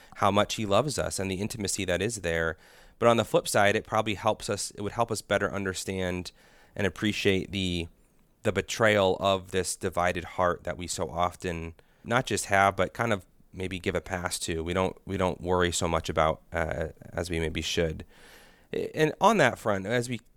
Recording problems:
none

